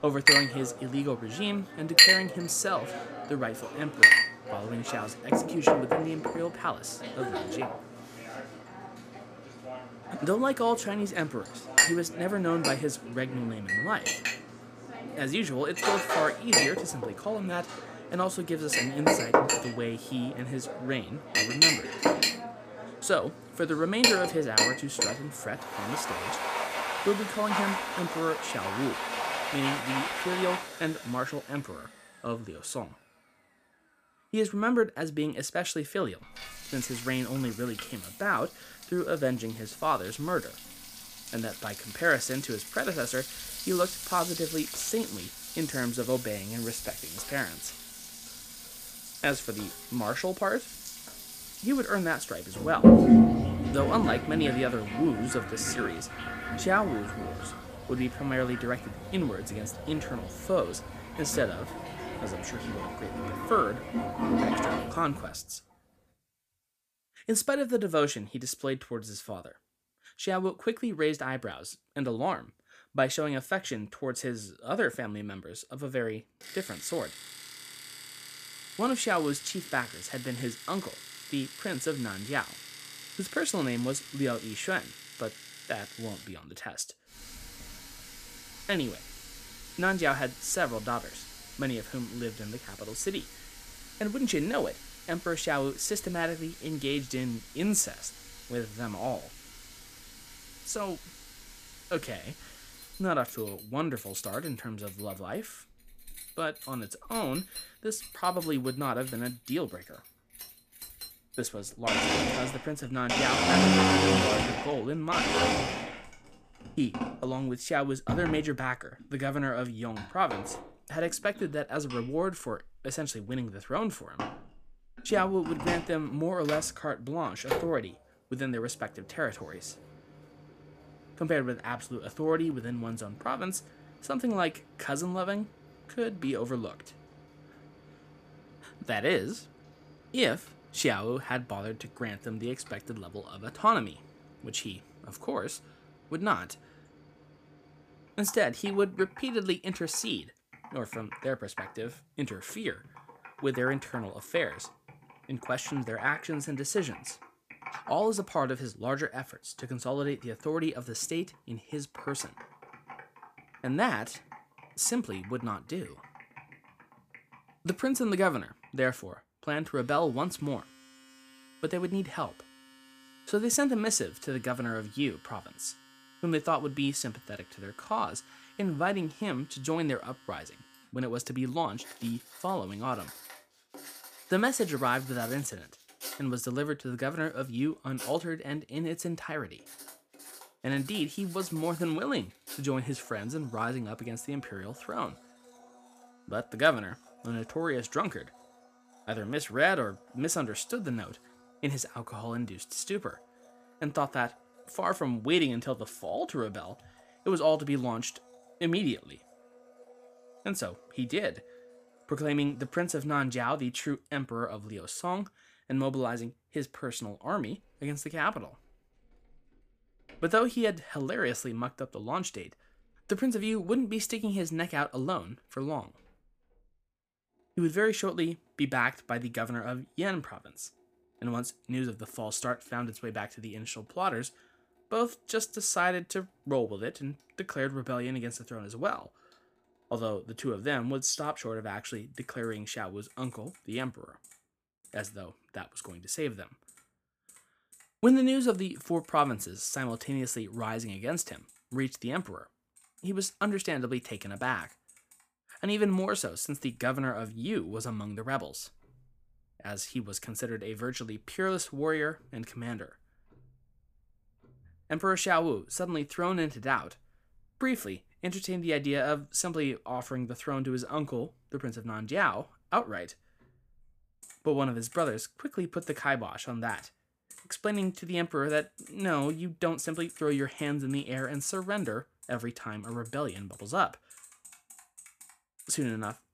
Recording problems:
household noises; very loud; throughout; 3 dB above the speech

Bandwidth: 15 kHz